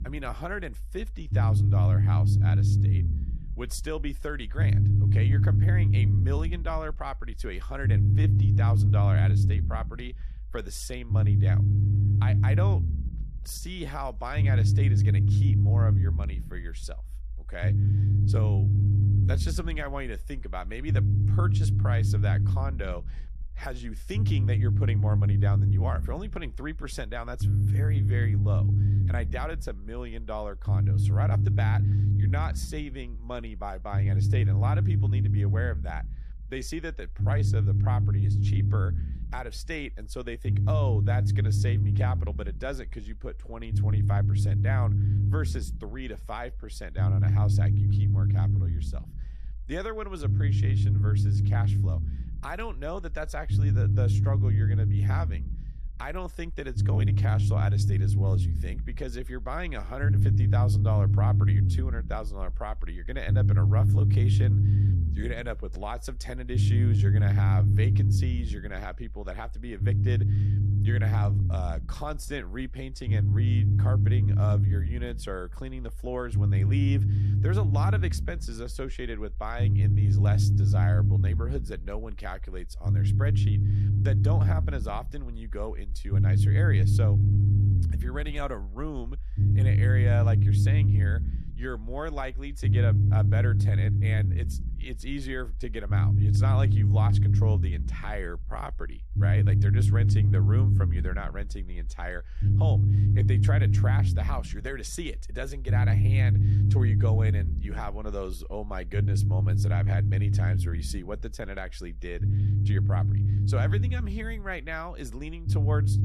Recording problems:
low rumble; loud; throughout; 1 dB below the speech

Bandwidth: 14 kHz